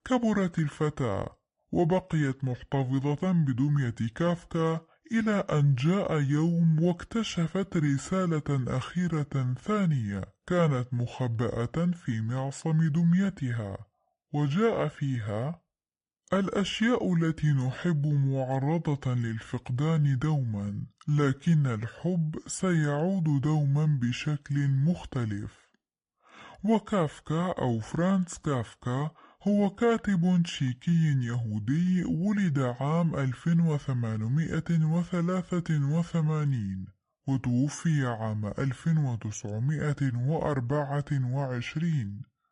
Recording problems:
wrong speed and pitch; too slow and too low; 0.7 times normal speed

